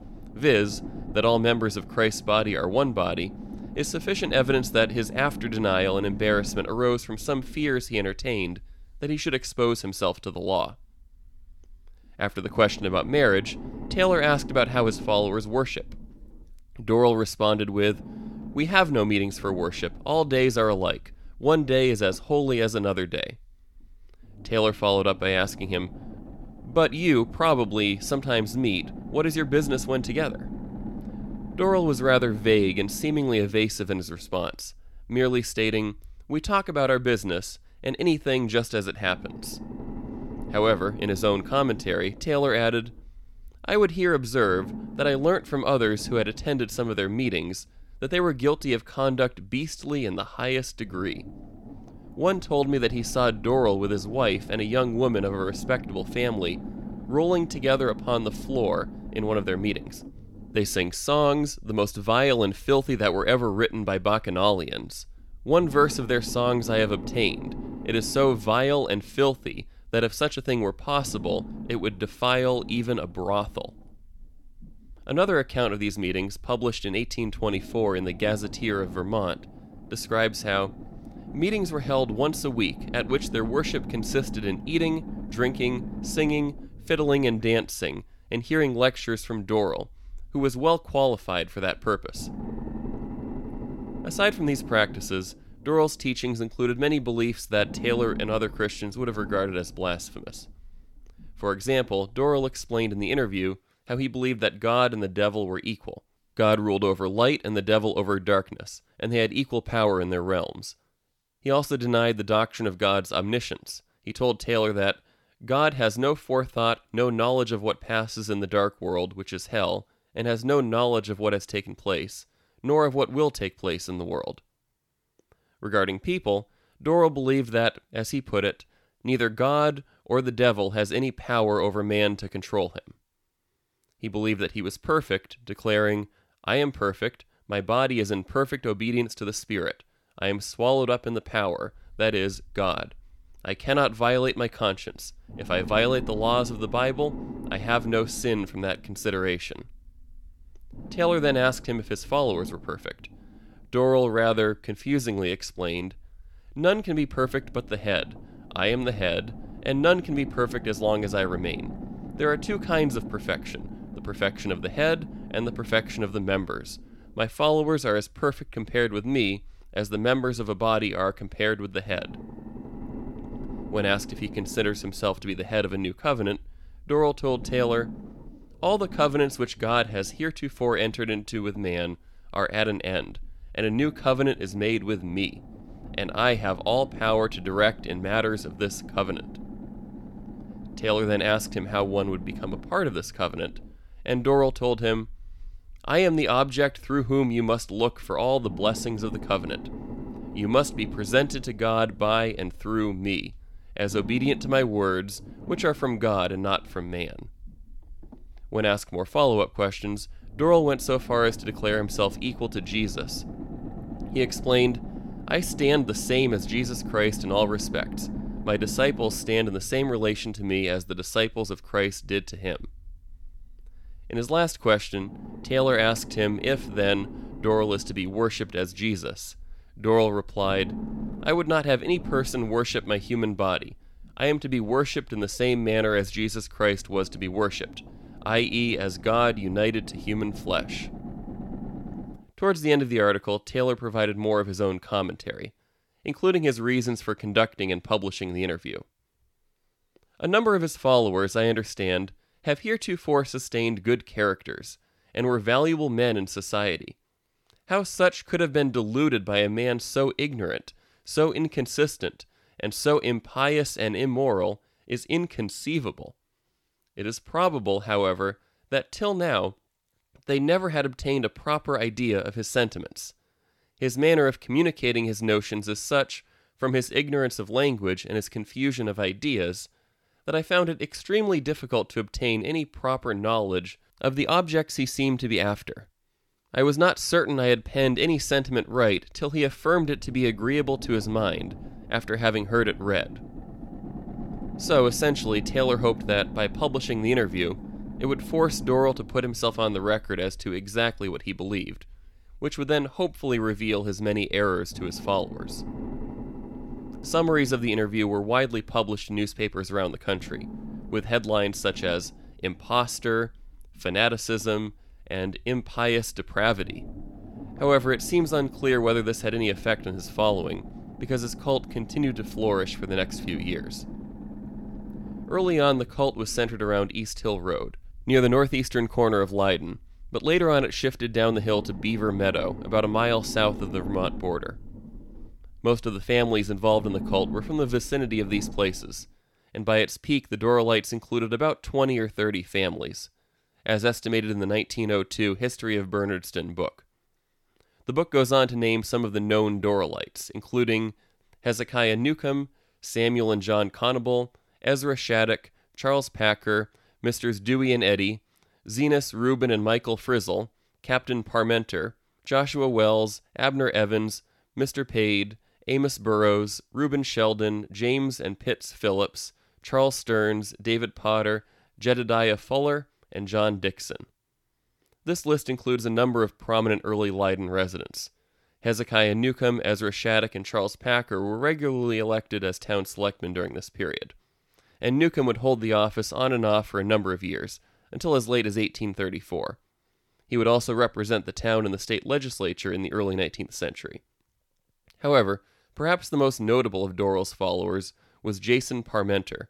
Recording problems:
low rumble; noticeable; until 1:43, from 2:22 to 4:02 and from 4:48 to 5:39; 20 dB below the speech

